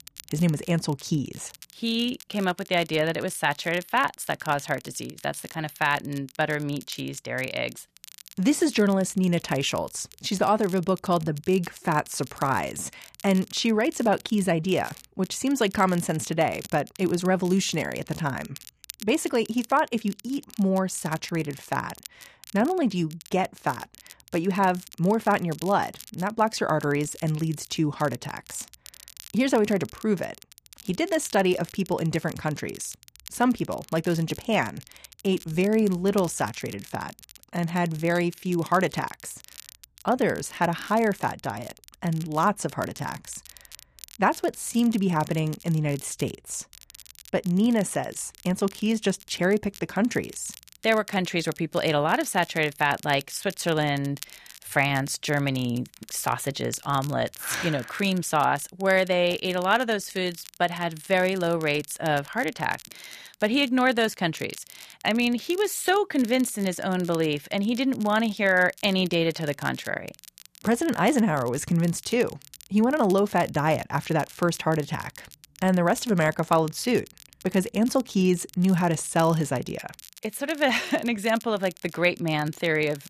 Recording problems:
crackle, like an old record; faint; 20 dB below the speech

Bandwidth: 14.5 kHz